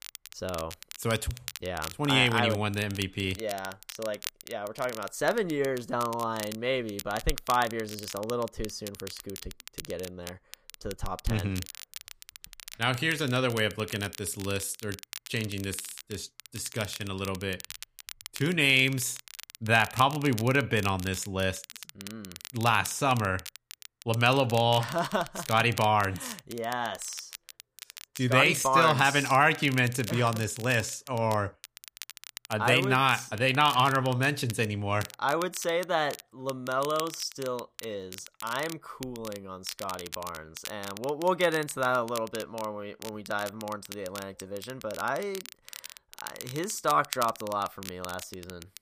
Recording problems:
crackle, like an old record; noticeable; 15 dB below the speech

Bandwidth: 15 kHz